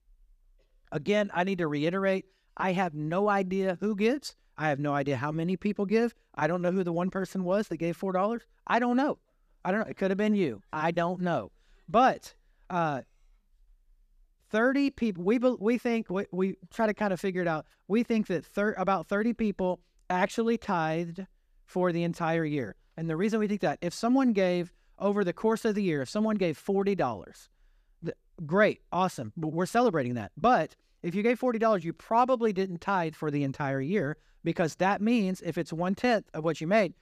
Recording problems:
none

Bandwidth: 14.5 kHz